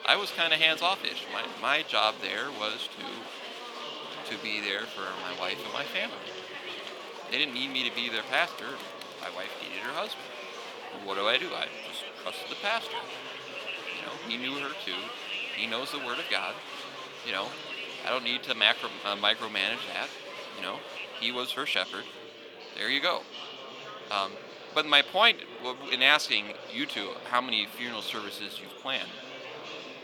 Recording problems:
thin; somewhat; fading below 450 Hz
murmuring crowd; noticeable; throughout; 10 dB below the speech

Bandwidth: 18 kHz